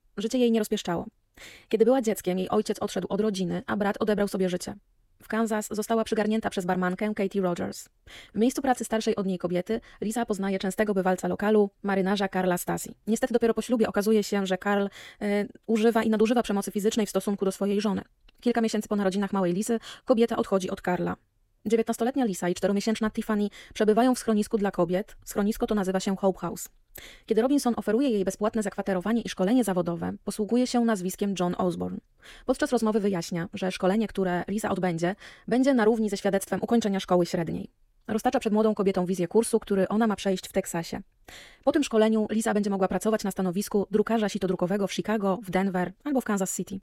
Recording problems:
wrong speed, natural pitch; too fast; 1.6 times normal speed

